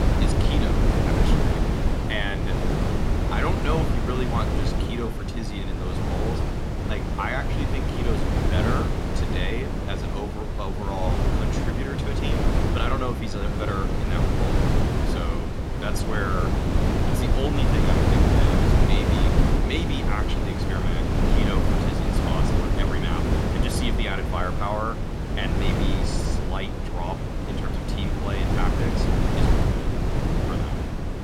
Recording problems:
wind noise on the microphone; heavy; 2 dB above the speech

